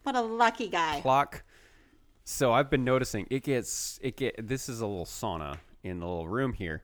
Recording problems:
none

